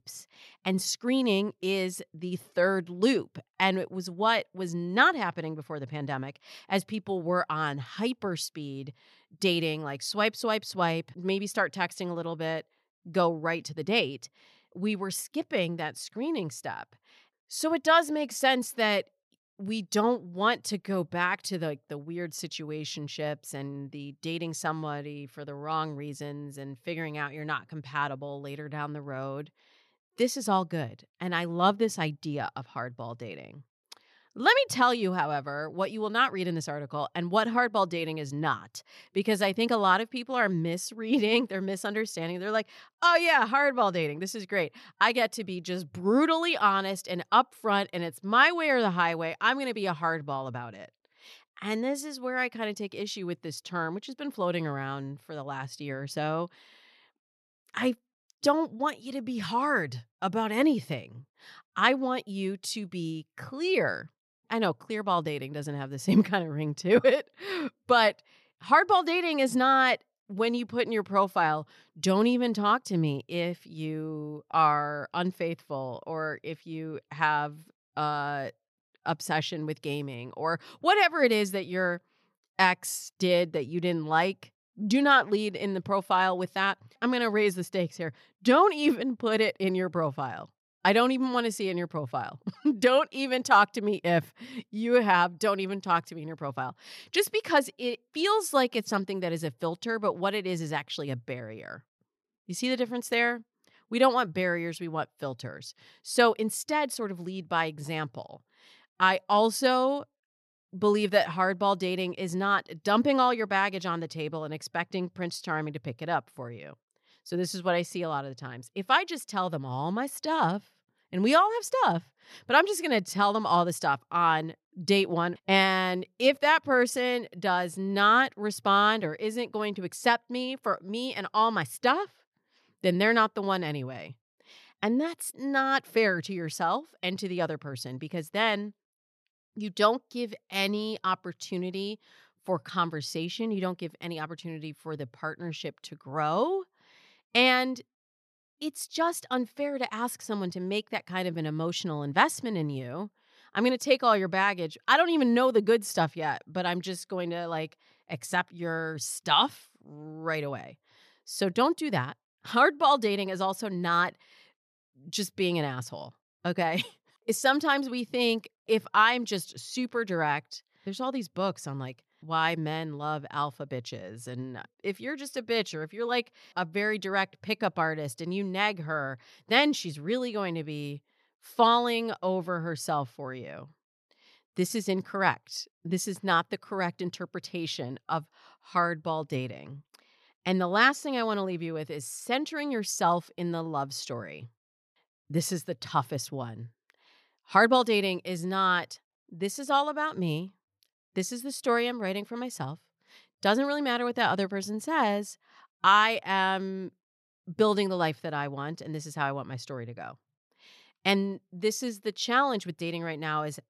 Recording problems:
none

